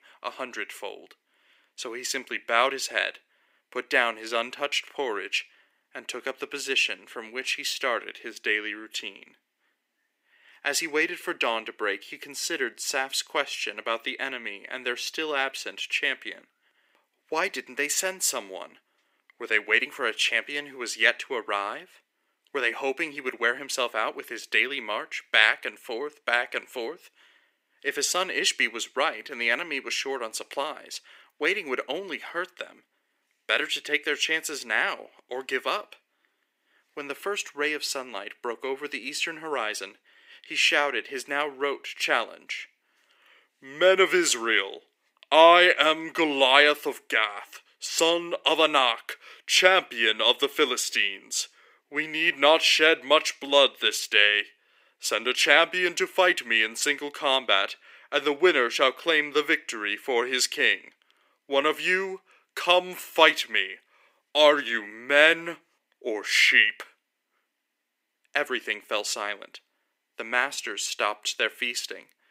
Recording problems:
thin; very; fading below 350 Hz

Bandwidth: 15.5 kHz